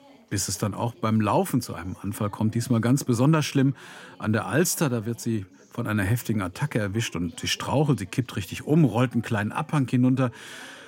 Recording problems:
background chatter; faint; throughout; 2 voices, 25 dB below the speech

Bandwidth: 16 kHz